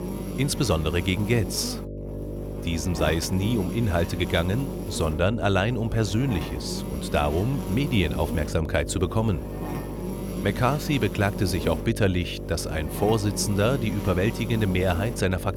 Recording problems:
electrical hum; loud; throughout; 50 Hz, 9 dB below the speech

